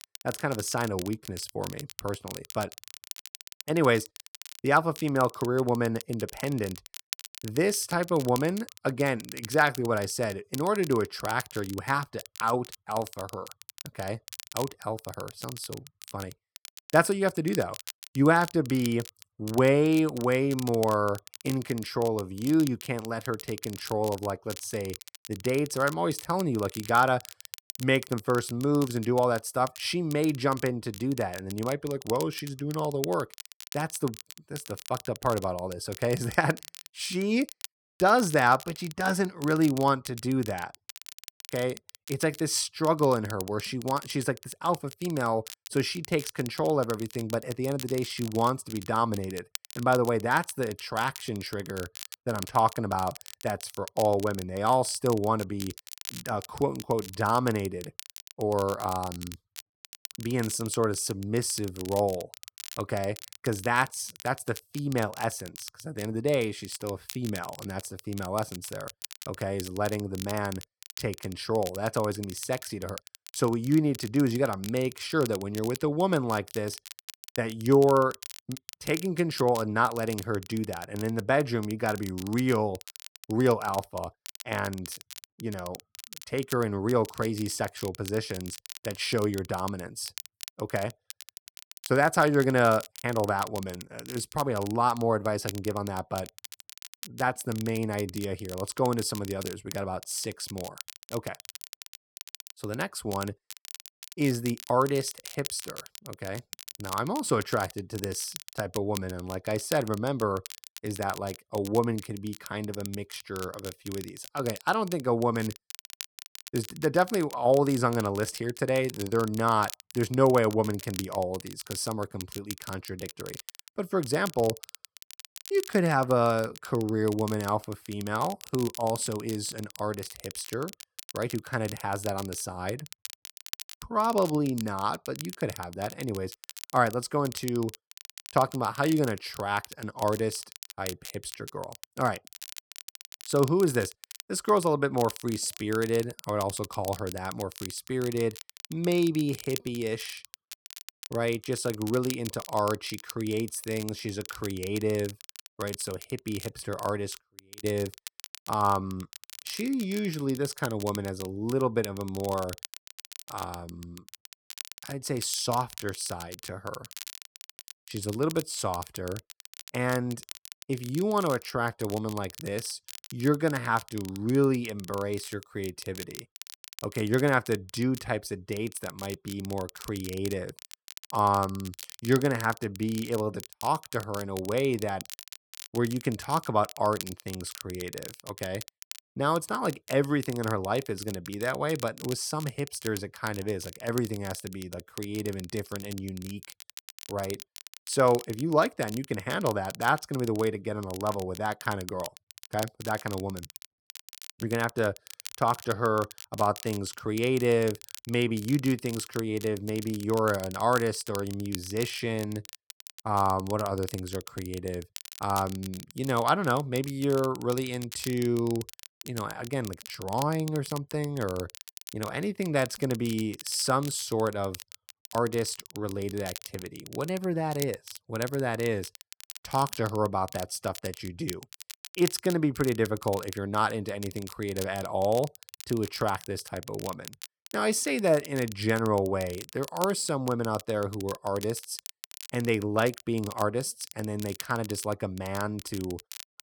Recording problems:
crackle, like an old record; noticeable; 15 dB below the speech

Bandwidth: 18.5 kHz